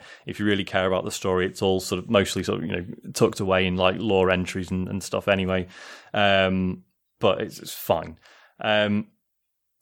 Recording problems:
none

